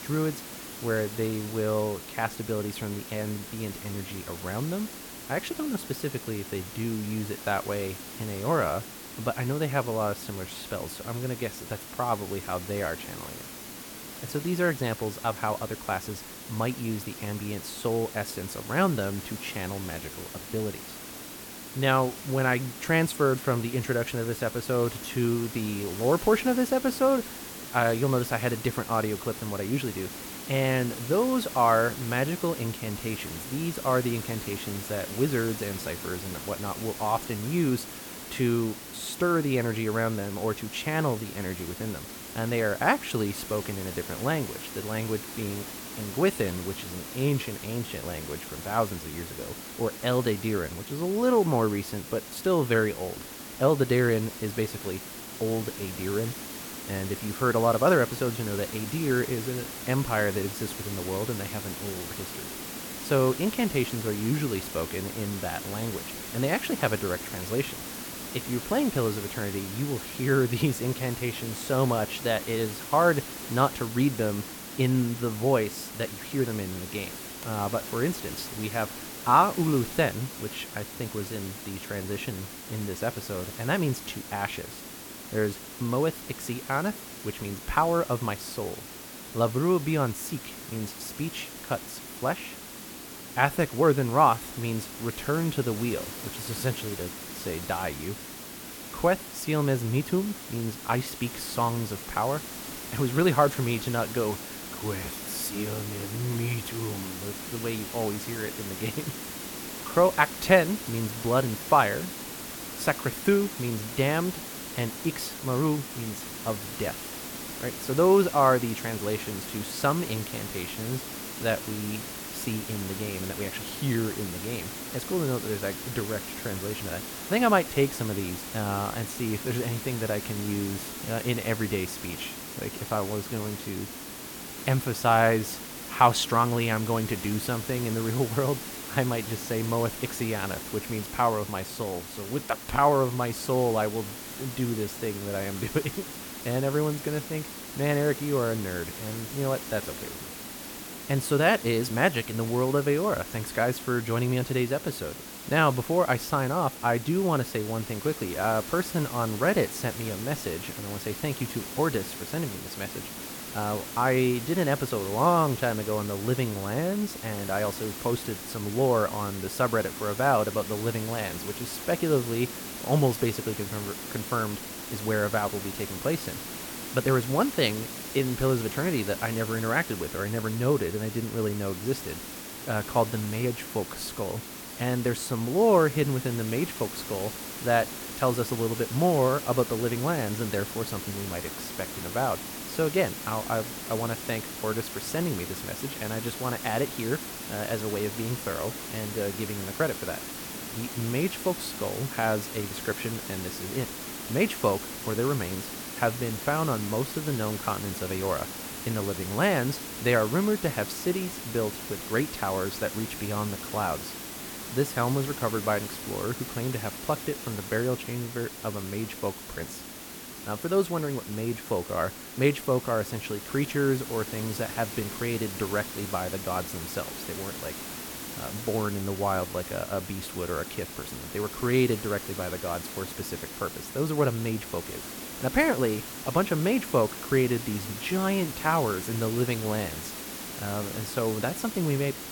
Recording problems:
hiss; loud; throughout; 8 dB below the speech

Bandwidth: 17.5 kHz